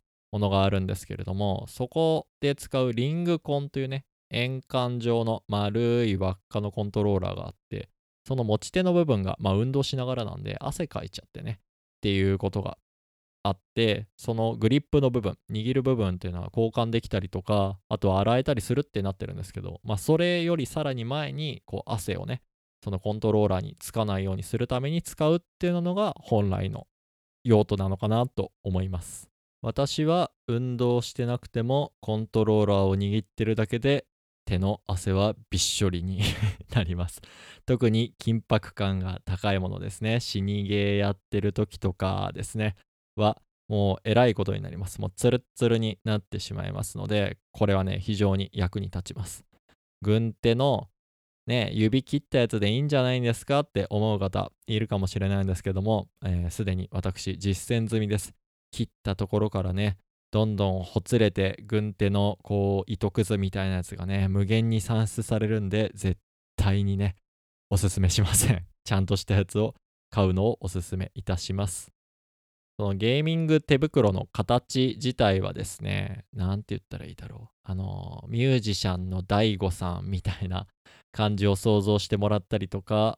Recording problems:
none

